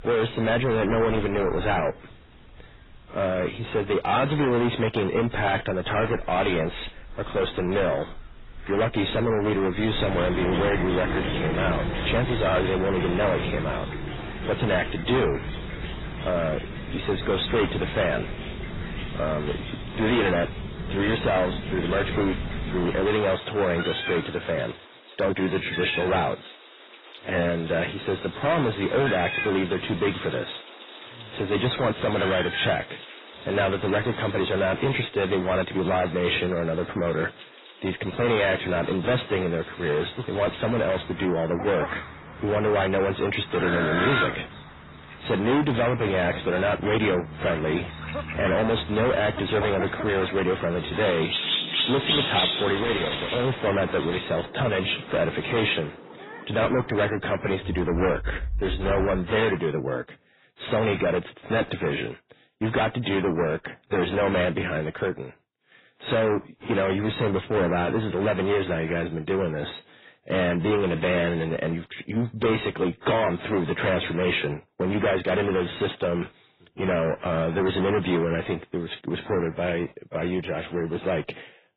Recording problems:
distortion; heavy; 6 dB below the speech
garbled, watery; badly; nothing above 4 kHz
animal sounds; loud; until 59 s; 6 dB below the speech

